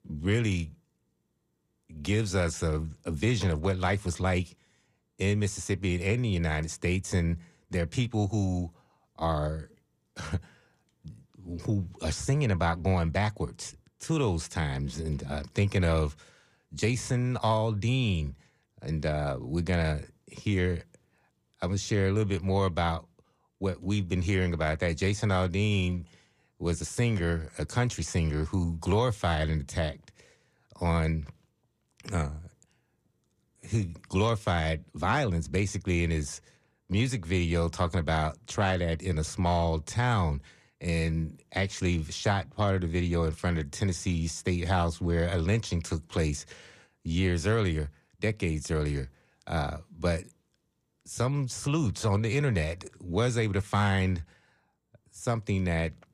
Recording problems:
none

